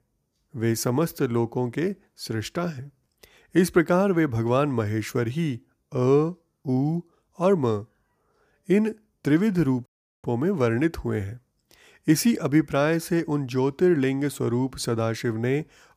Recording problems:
audio cutting out; at 10 s

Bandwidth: 15 kHz